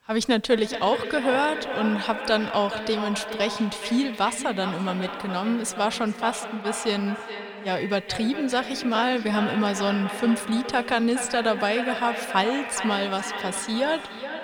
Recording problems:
echo of what is said; strong; throughout; 420 ms later, 7 dB below the speech

